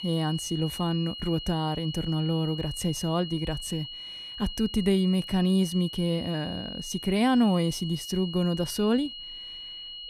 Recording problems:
high-pitched whine; loud; throughout; 3 kHz, 10 dB below the speech

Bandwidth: 14.5 kHz